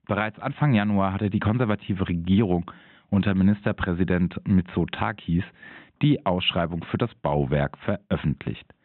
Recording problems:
high frequencies cut off; severe; nothing above 3.5 kHz

